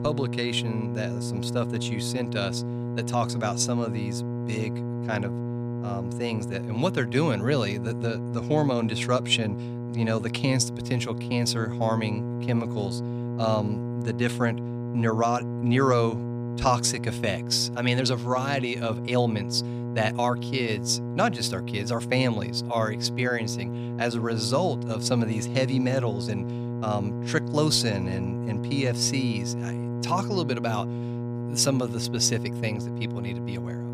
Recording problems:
electrical hum; loud; throughout; 60 Hz, 10 dB below the speech

